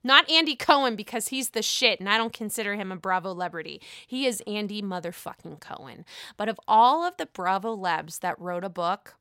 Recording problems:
none

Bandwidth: 16 kHz